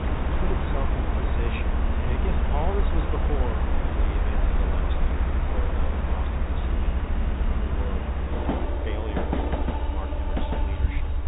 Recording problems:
high frequencies cut off; severe; nothing above 4 kHz
train or aircraft noise; very loud; throughout; 6 dB above the speech
low rumble; noticeable; throughout; 10 dB below the speech

